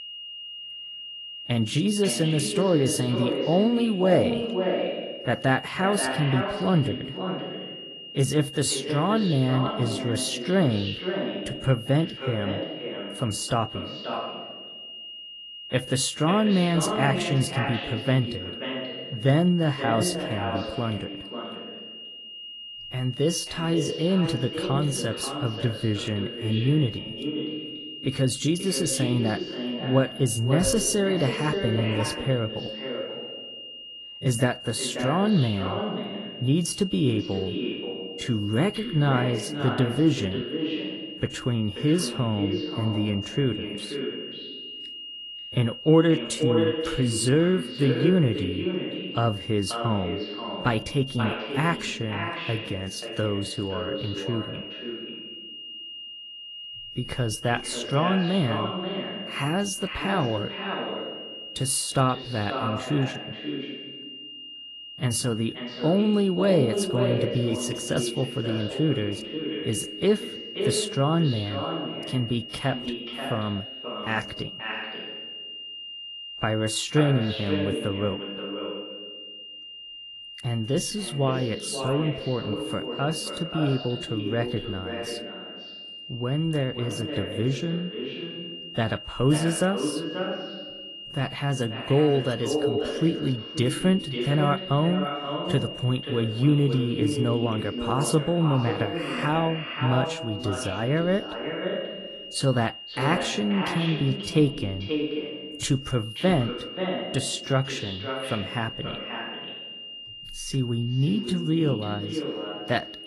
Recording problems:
echo of what is said; strong; throughout; 530 ms later, 7 dB below the speech
garbled, watery; slightly; nothing above 11 kHz
high-pitched whine; noticeable; throughout; 3 kHz, 10 dB below the speech

